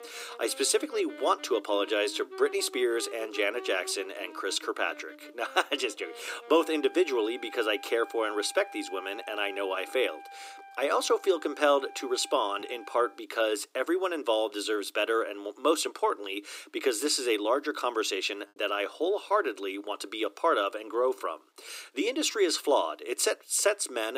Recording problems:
thin; very; fading below 300 Hz
background music; noticeable; throughout; 15 dB below the speech
choppy; occasionally; from 18 to 22 s; 1% of the speech affected
abrupt cut into speech; at the end

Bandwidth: 15.5 kHz